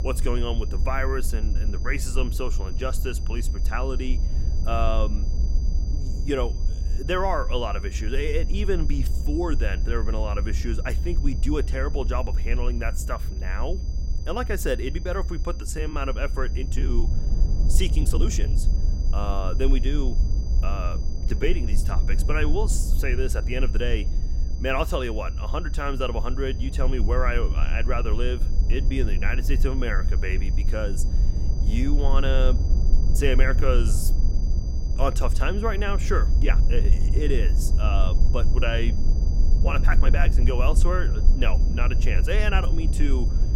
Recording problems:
high-pitched whine; noticeable; throughout; 5 kHz, 20 dB below the speech
low rumble; noticeable; throughout; 15 dB below the speech
uneven, jittery; strongly; from 16 to 40 s

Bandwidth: 16 kHz